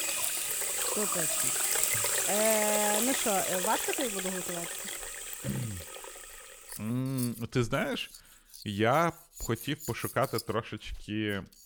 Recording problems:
household noises; very loud; throughout; 3 dB above the speech

